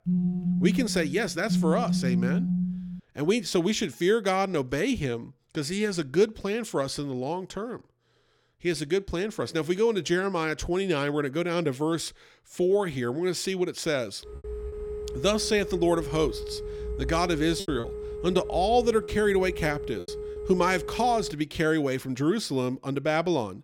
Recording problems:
phone ringing; loud; until 3 s; peak 1 dB above the speech
phone ringing; noticeable; from 14 to 21 s; peak 7 dB below the speech
choppy; occasionally; from 18 to 20 s; 4% of the speech affected

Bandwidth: 17 kHz